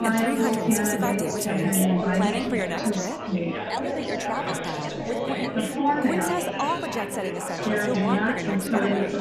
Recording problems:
chatter from many people; very loud; throughout; 4 dB above the speech

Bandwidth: 14 kHz